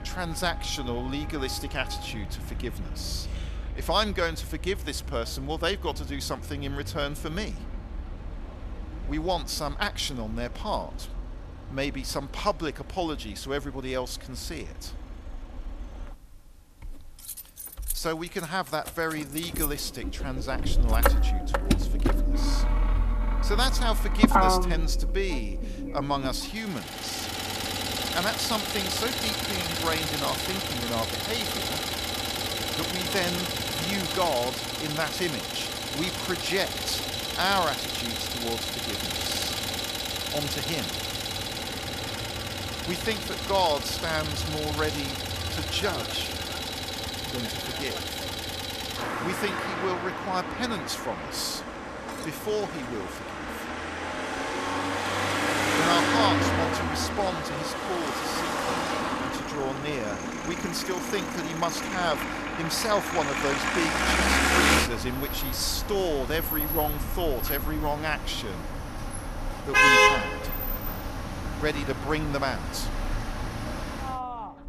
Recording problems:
traffic noise; very loud; throughout; 2 dB above the speech

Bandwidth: 14 kHz